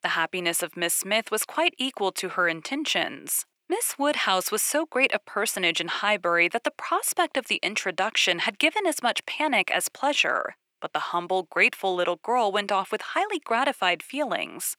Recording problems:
thin; somewhat; fading below 500 Hz

